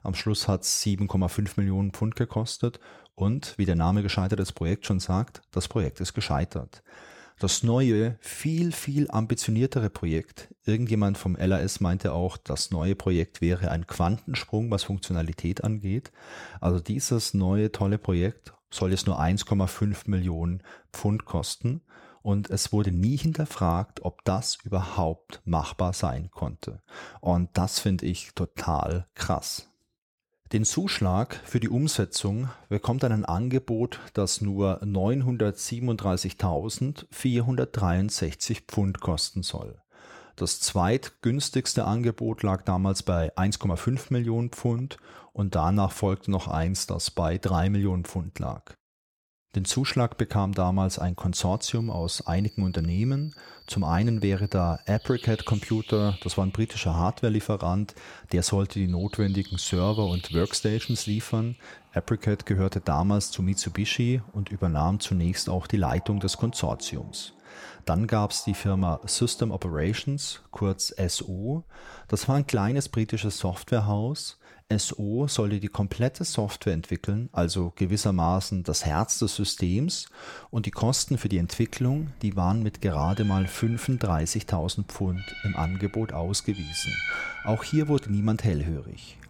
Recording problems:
animal sounds; noticeable; from 52 s on; 15 dB below the speech

